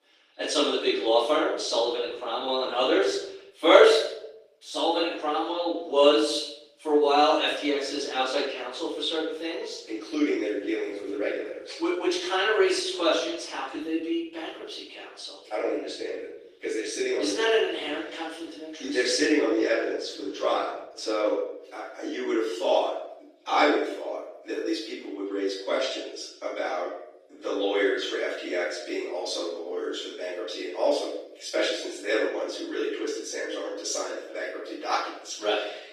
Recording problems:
off-mic speech; far
room echo; noticeable; dies away in 0.7 s
thin; somewhat; fading below 300 Hz
garbled, watery; slightly; nothing above 14.5 kHz

